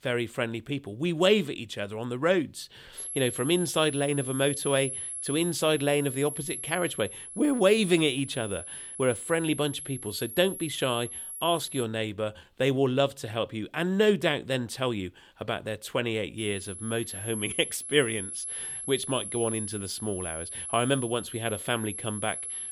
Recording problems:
high-pitched whine; loud; from 3 to 12 s and from 16 s on; 11 kHz, 7 dB below the speech

